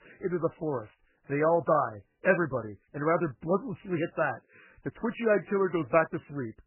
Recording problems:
garbled, watery; badly; nothing above 2.5 kHz

